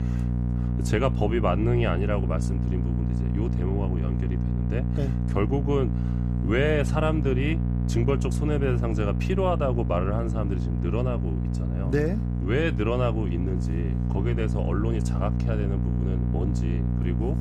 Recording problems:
electrical hum; loud; throughout; 60 Hz, 7 dB below the speech

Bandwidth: 14.5 kHz